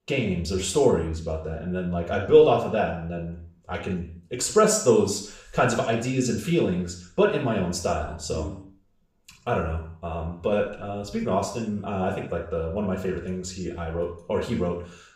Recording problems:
off-mic speech; far
room echo; noticeable; dies away in 0.5 s

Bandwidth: 15.5 kHz